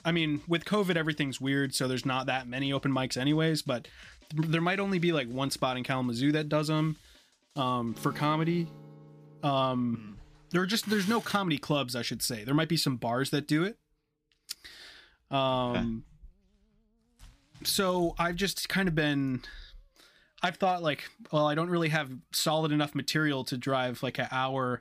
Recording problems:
background music; faint; throughout; 25 dB below the speech

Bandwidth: 15 kHz